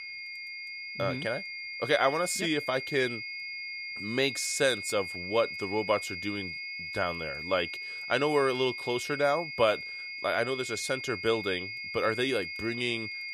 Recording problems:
high-pitched whine; loud; throughout; 2 kHz, 6 dB below the speech

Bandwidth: 14.5 kHz